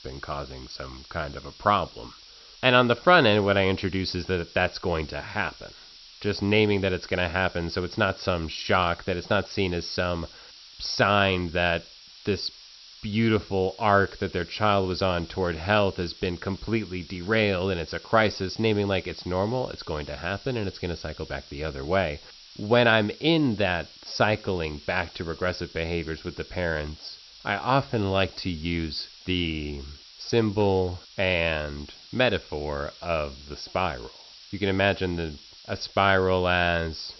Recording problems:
high frequencies cut off; noticeable; nothing above 5.5 kHz
hiss; noticeable; throughout; 20 dB below the speech

